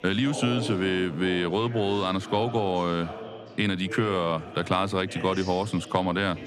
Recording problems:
chatter from many people; noticeable; throughout; 10 dB below the speech

